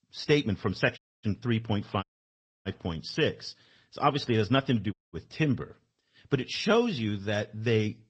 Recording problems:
garbled, watery; slightly
audio cutting out; at 1 s, at 2 s for 0.5 s and at 5 s

